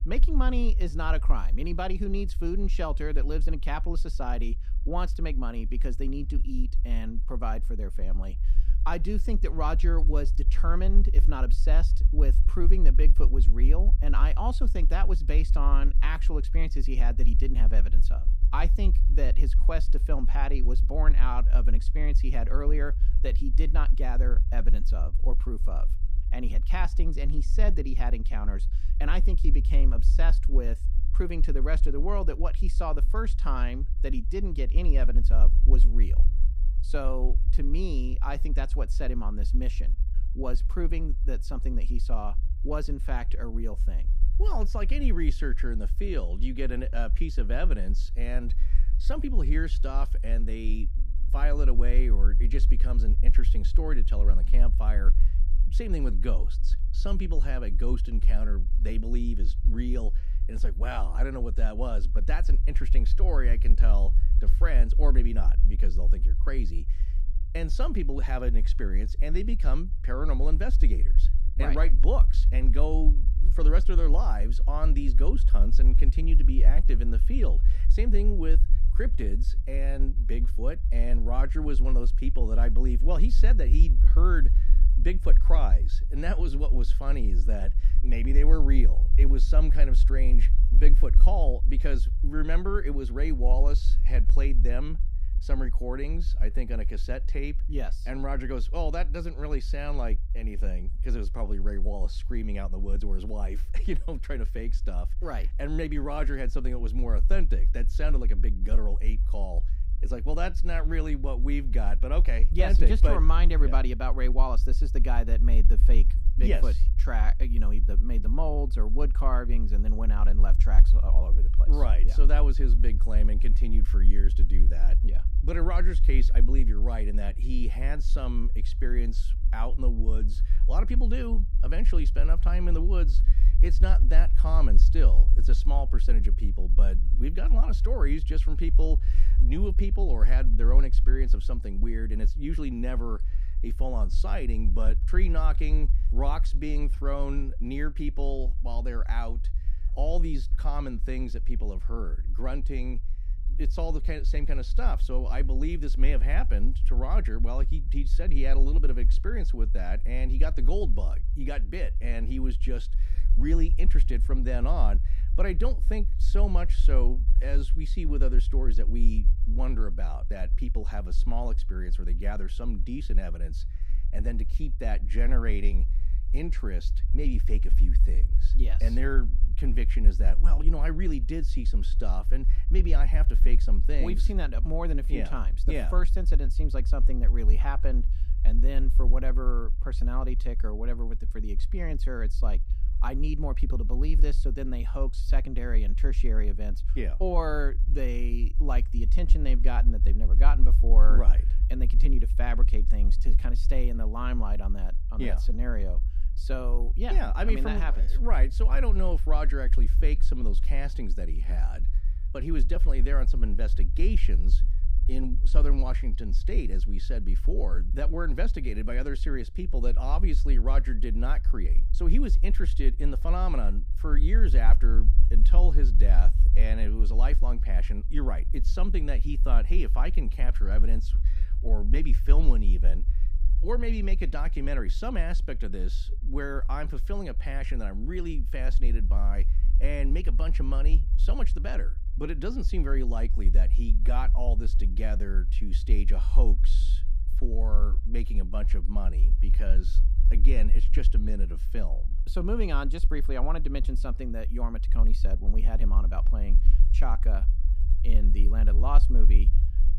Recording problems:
low rumble; noticeable; throughout; 15 dB below the speech

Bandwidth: 15.5 kHz